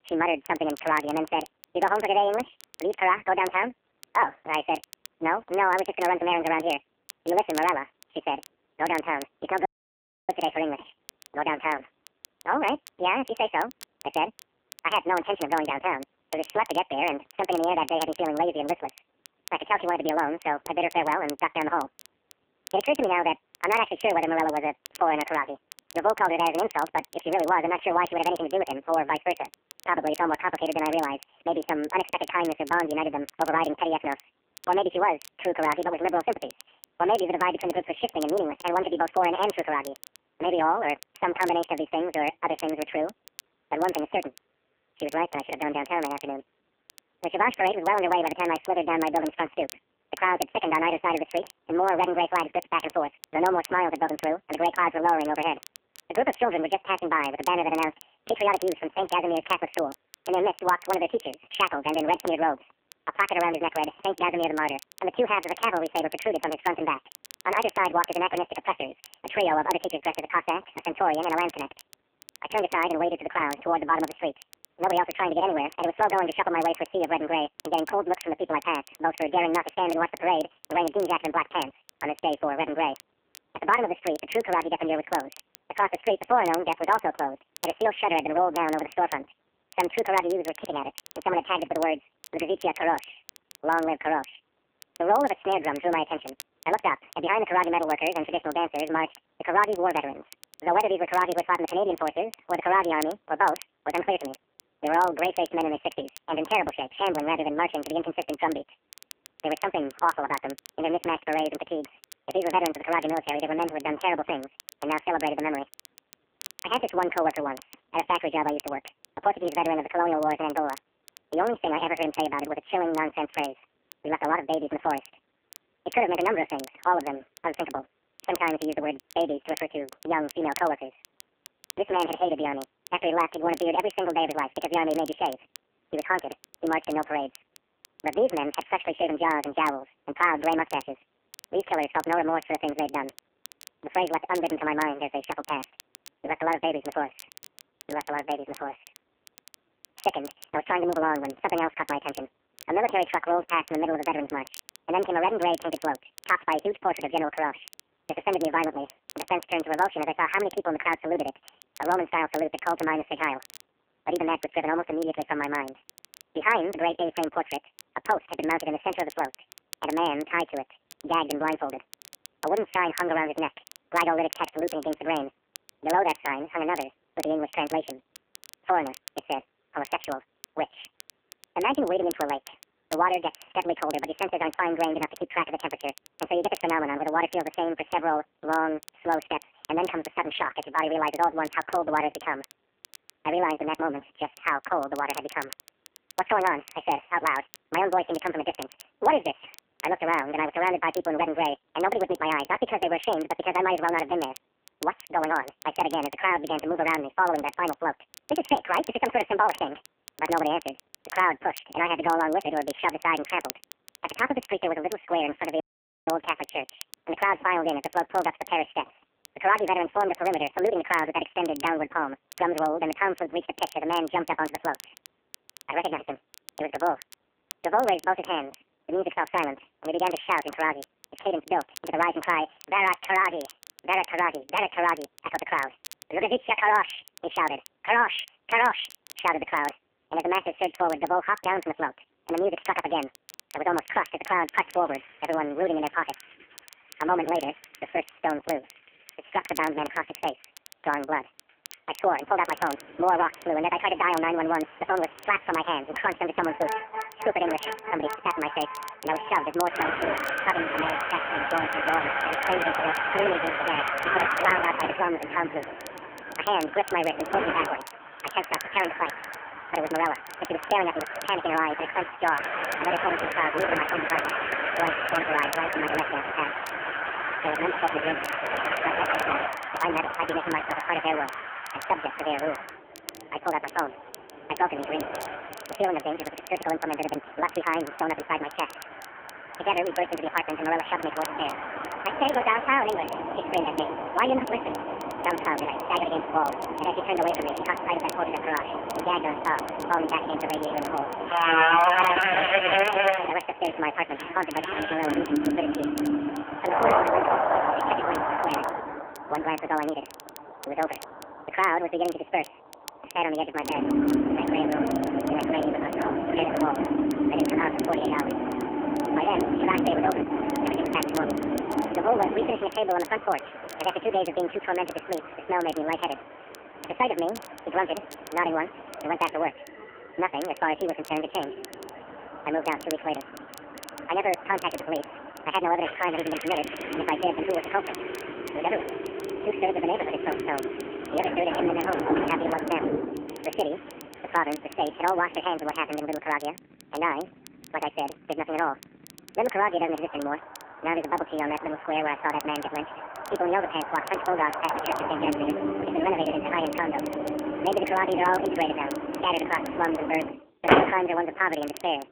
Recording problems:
phone-call audio; poor line; nothing above 3 kHz
wrong speed and pitch; too fast and too high; 1.7 times normal speed
traffic noise; loud; from 4:05 on; 3 dB below the speech
crackle, like an old record; faint; 20 dB below the speech
audio cutting out; at 9.5 s for 0.5 s and at 3:36

